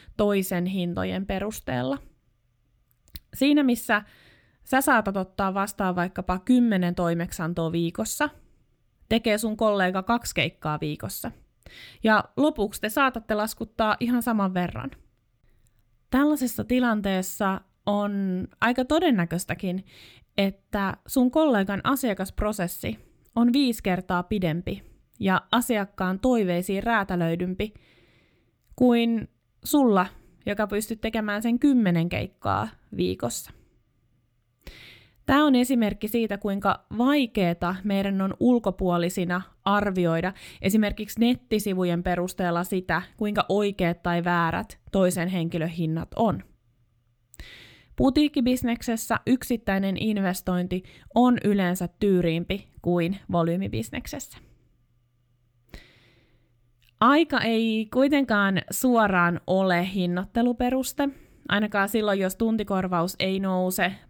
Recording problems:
none

